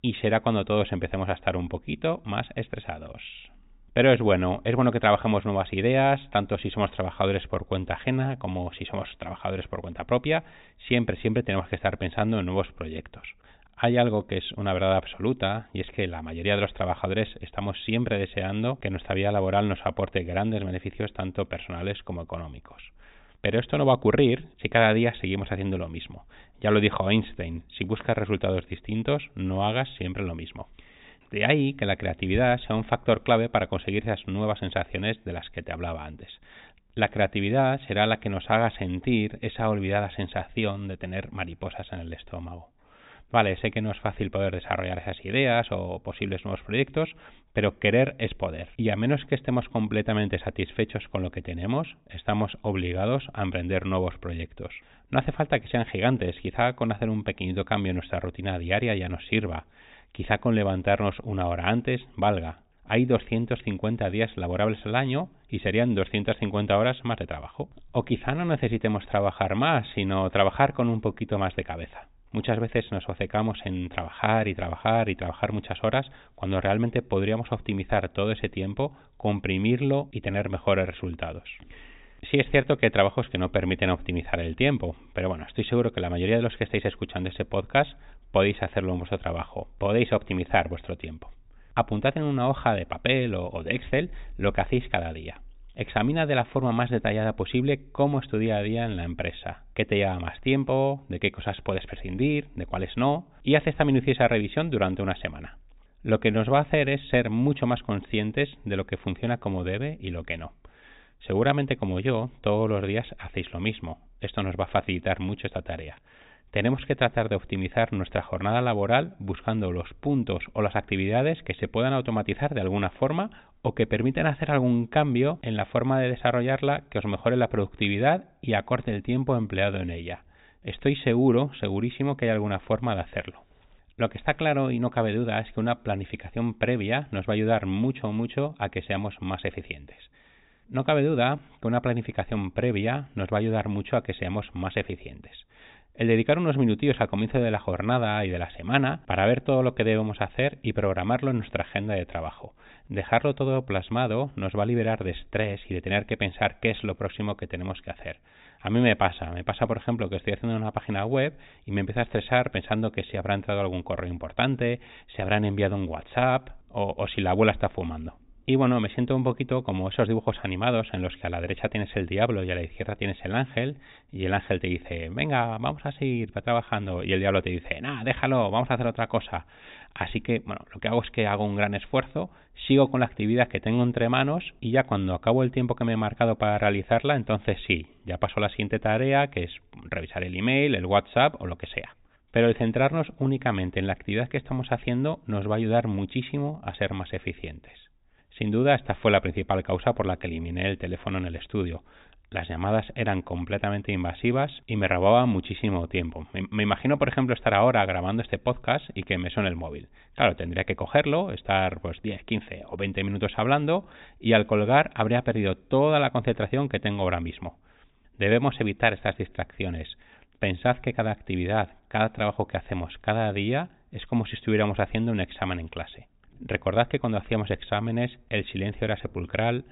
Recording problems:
high frequencies cut off; severe; nothing above 4 kHz

